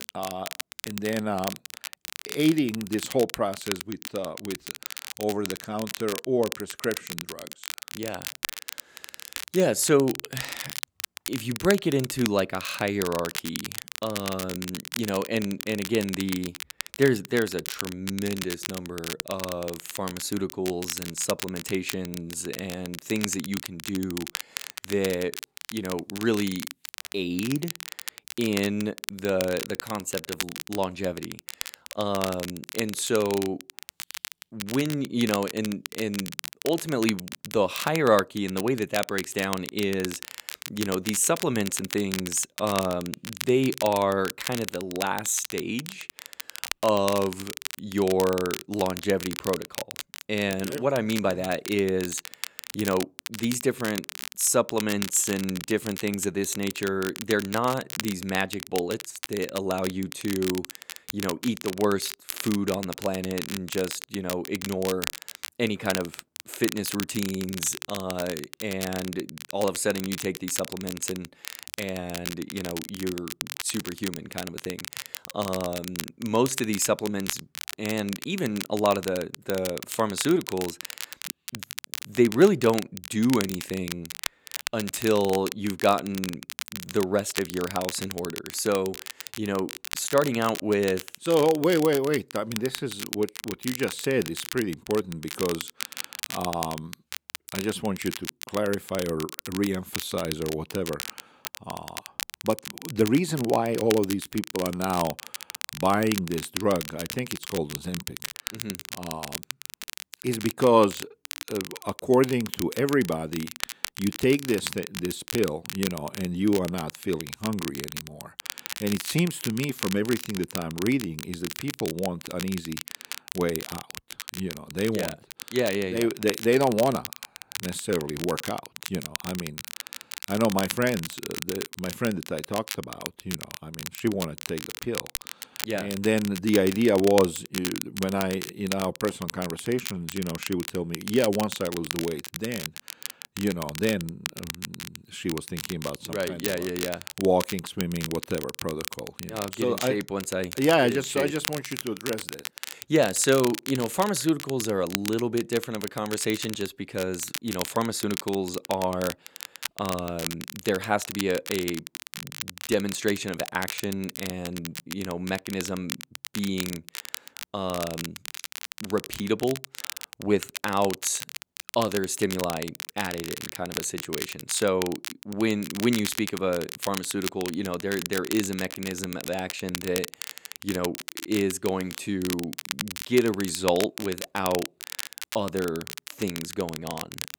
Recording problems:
crackle, like an old record; loud; 8 dB below the speech

